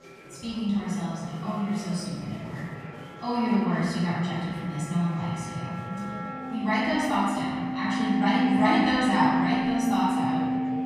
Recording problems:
room echo; strong; dies away in 1.8 s
off-mic speech; far
background music; loud; throughout; 1 dB below the speech
murmuring crowd; noticeable; throughout; 20 dB below the speech

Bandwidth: 14 kHz